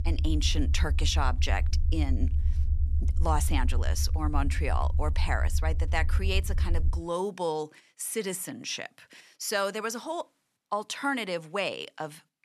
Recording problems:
low rumble; noticeable; until 7 s; 15 dB below the speech

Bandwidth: 13.5 kHz